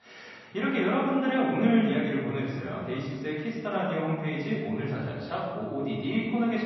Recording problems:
off-mic speech; far
room echo; noticeable; dies away in 1.5 s
garbled, watery; slightly; nothing above 5.5 kHz

